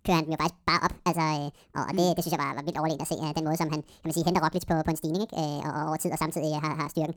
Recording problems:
wrong speed and pitch; too fast and too high; 1.7 times normal speed

